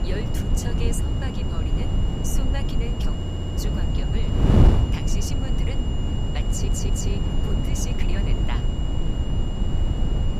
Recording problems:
wind noise on the microphone; heavy; 3 dB above the speech
high-pitched whine; loud; throughout; 3 kHz, 6 dB below the speech
audio stuttering; at 3 s and at 6.5 s

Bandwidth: 15 kHz